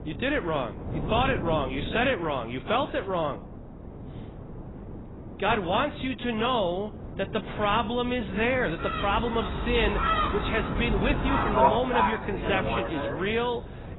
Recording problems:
garbled, watery; badly; nothing above 4 kHz
animal sounds; loud; from 9 s on; 1 dB below the speech
wind noise on the microphone; occasional gusts; 15 dB below the speech

